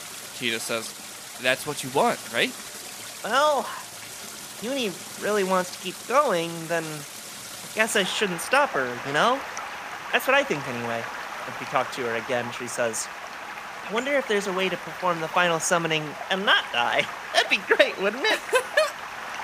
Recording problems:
rain or running water; noticeable; throughout; 10 dB below the speech

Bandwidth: 15 kHz